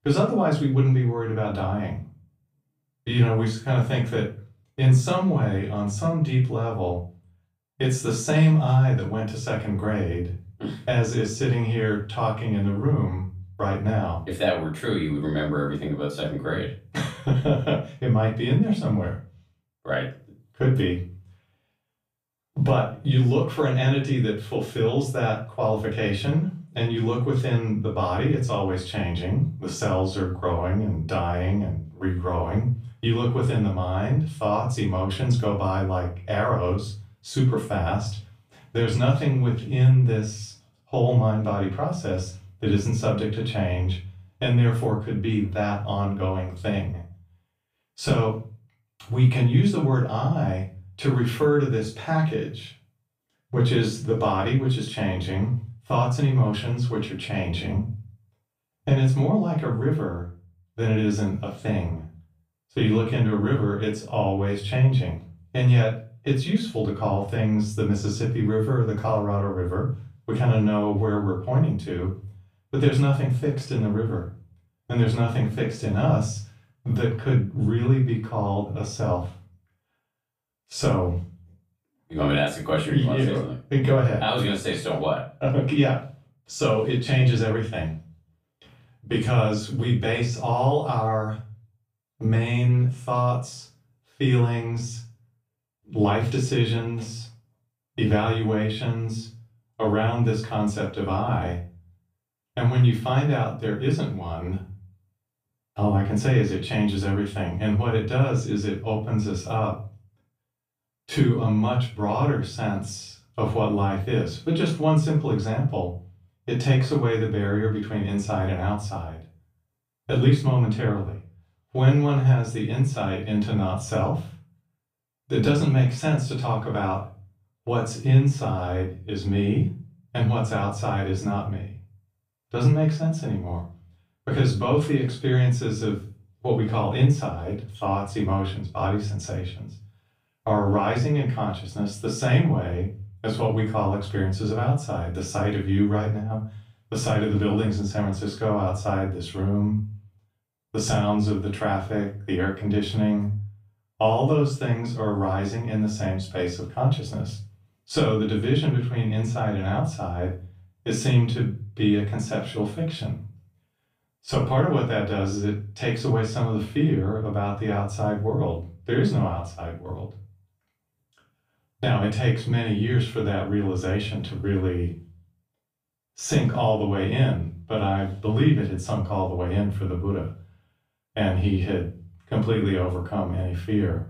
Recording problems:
off-mic speech; far
room echo; slight; dies away in 0.3 s

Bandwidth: 15 kHz